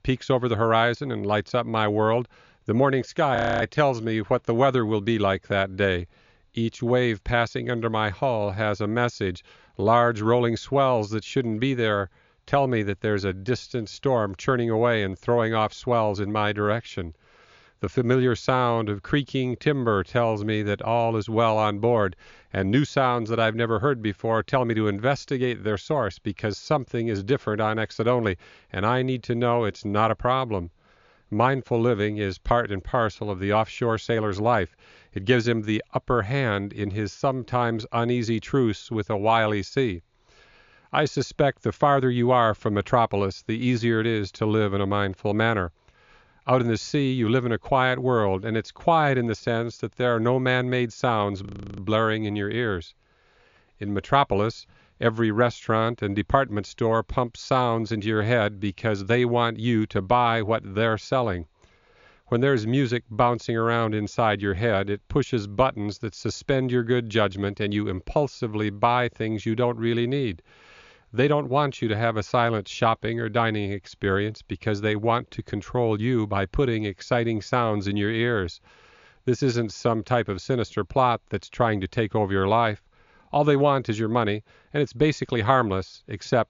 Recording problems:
high frequencies cut off; noticeable; nothing above 7 kHz
audio freezing; at 3.5 s and at 51 s

